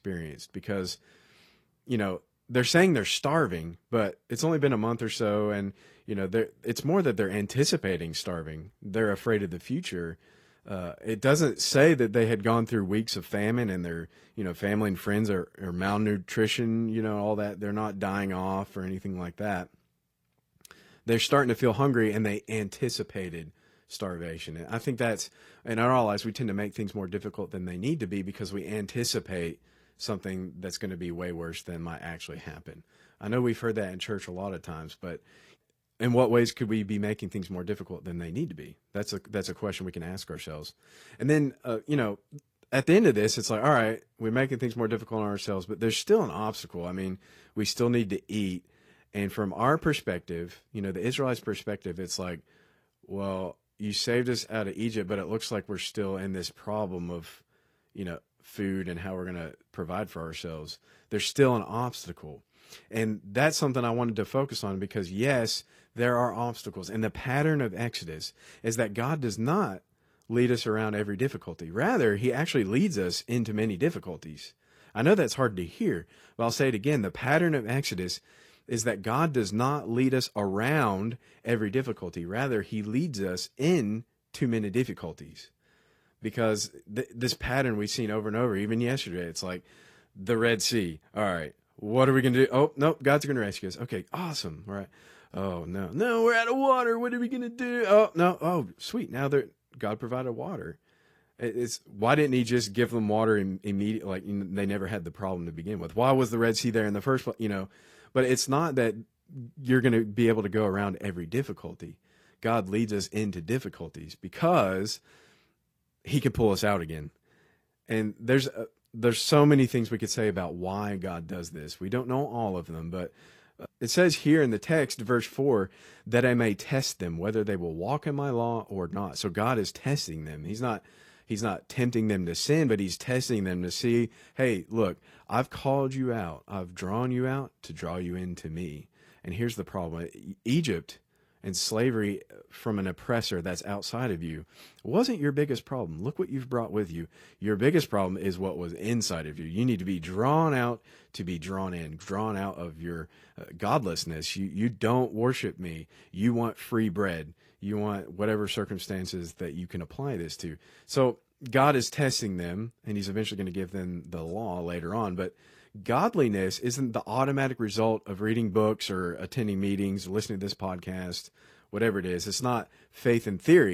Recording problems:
garbled, watery; slightly; nothing above 14.5 kHz
abrupt cut into speech; at the end

